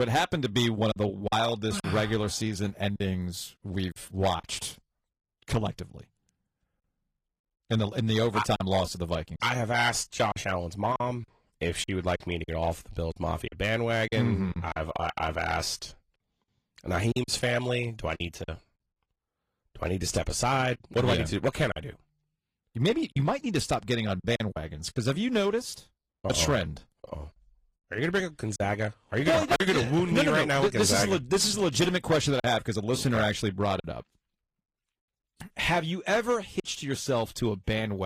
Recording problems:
distortion; slight; 3% of the sound clipped
garbled, watery; slightly; nothing above 14.5 kHz
choppy; occasionally; 5% of the speech affected
abrupt cut into speech; at the start and the end

